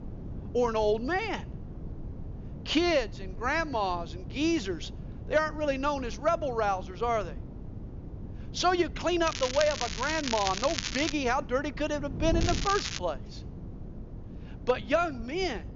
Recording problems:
high frequencies cut off; noticeable; nothing above 7 kHz
crackling; loud; from 9.5 to 11 s and at 12 s; 5 dB below the speech
wind noise on the microphone; occasional gusts; 20 dB below the speech

